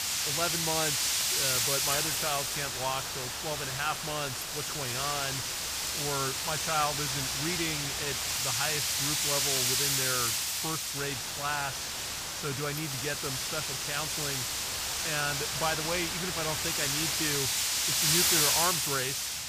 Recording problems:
wind noise on the microphone; heavy; 5 dB above the speech
hiss; loud; from 2 to 8.5 s and from 11 to 17 s; 5 dB below the speech

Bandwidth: 15 kHz